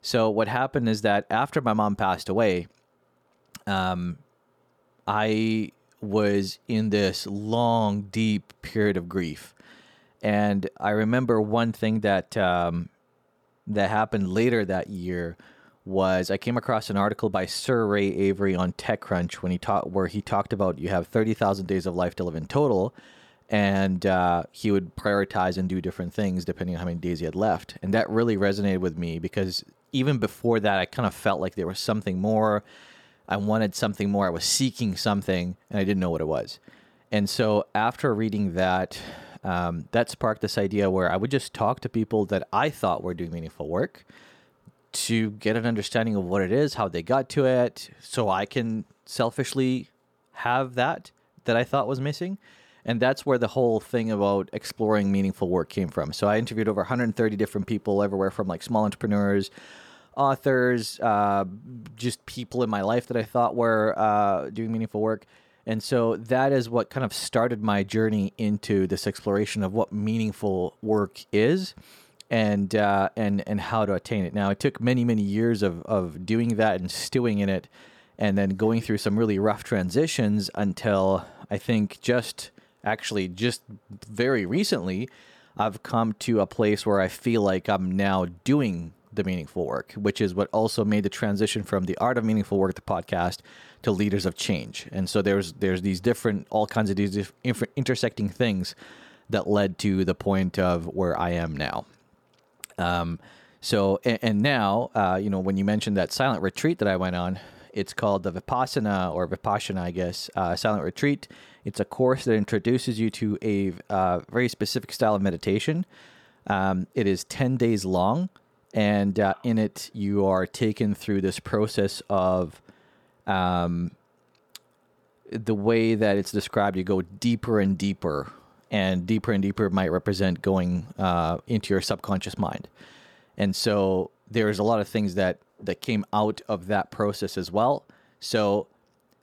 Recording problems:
none

